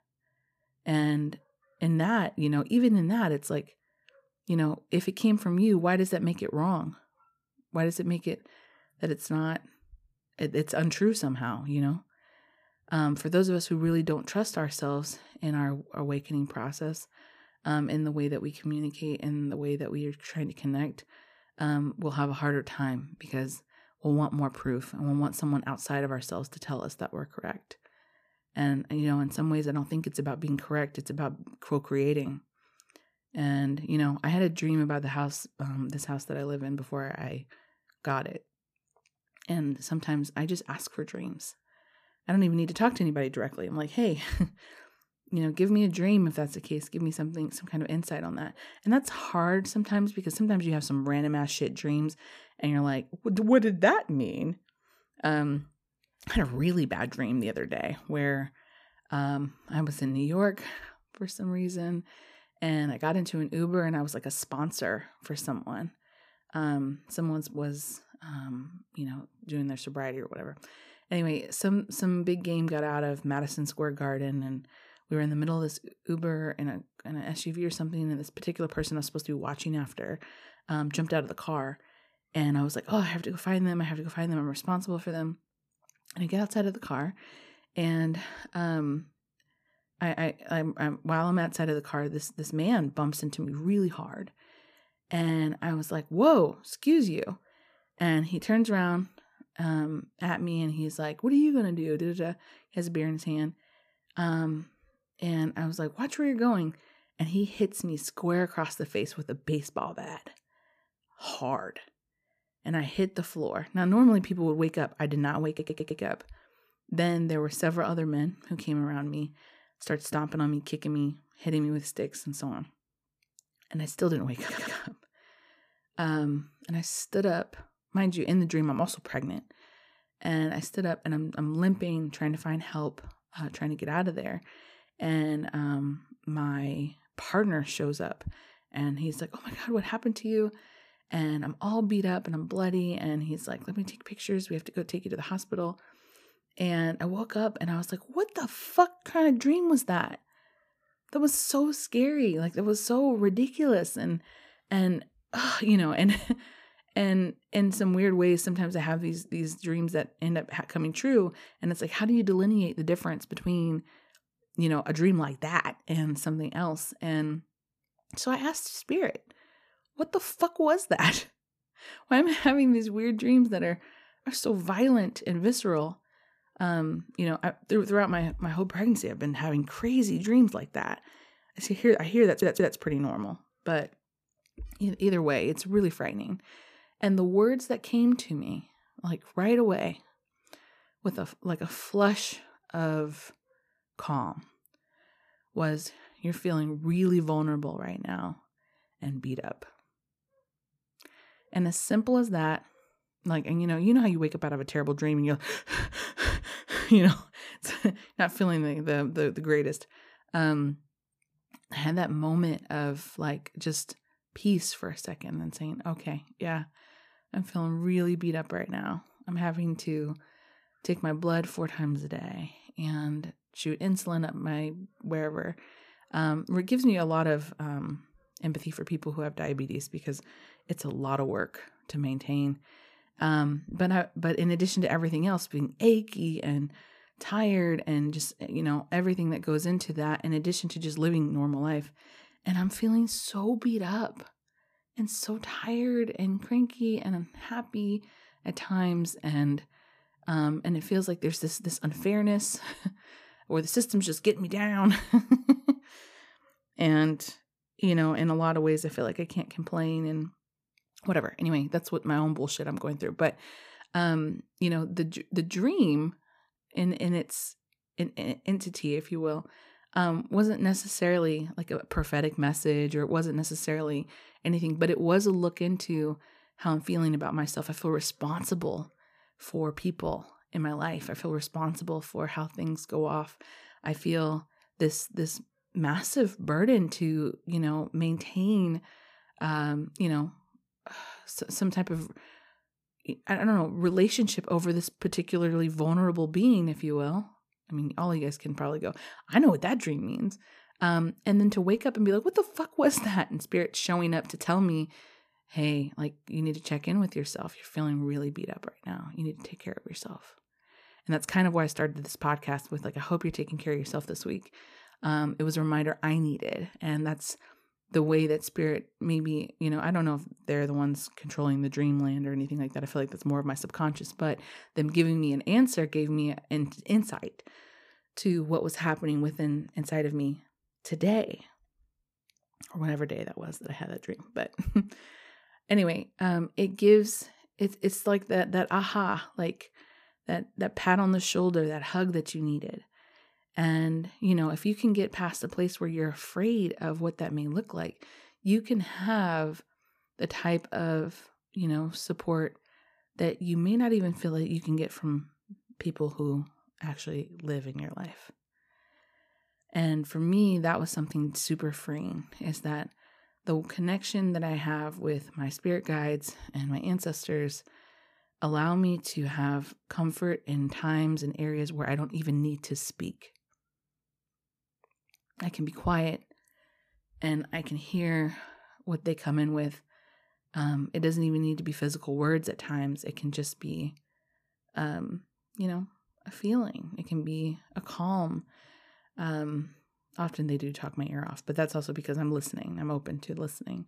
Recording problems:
audio stuttering; at 1:55, at 2:04 and at 3:02

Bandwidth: 14.5 kHz